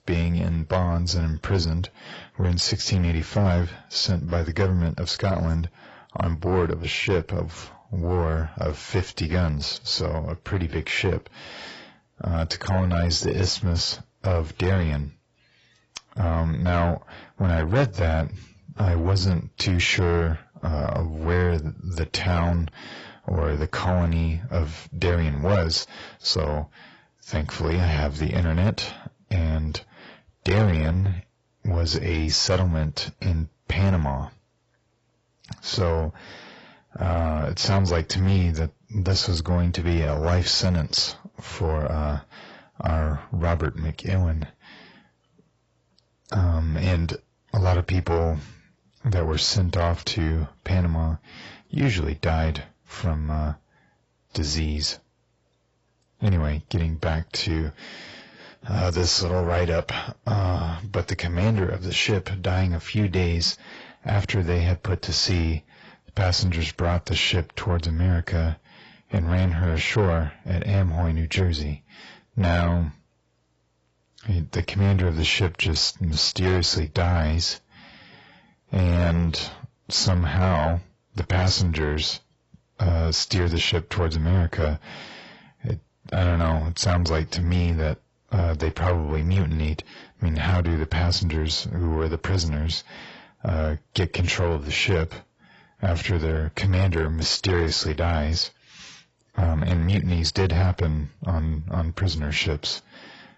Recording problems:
garbled, watery; badly; nothing above 7.5 kHz
distortion; slight; 10 dB below the speech

